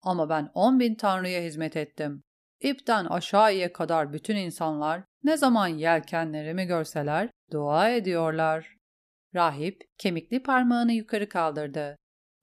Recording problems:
none

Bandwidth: 14.5 kHz